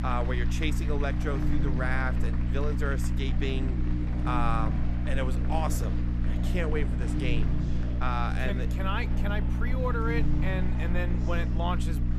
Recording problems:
electrical hum; loud; throughout; 60 Hz, 8 dB below the speech
murmuring crowd; loud; throughout; 9 dB below the speech
machinery noise; noticeable; throughout; 20 dB below the speech

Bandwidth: 13.5 kHz